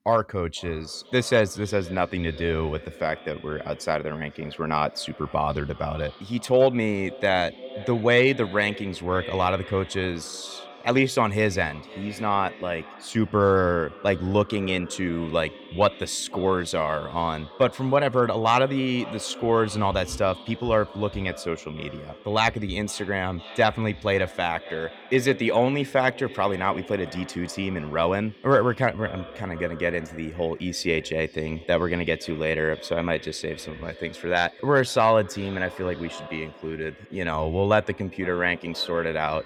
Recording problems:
echo of what is said; noticeable; throughout; 500 ms later, 15 dB below the speech

